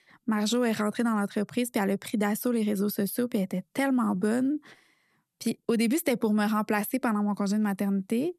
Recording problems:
none

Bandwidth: 13.5 kHz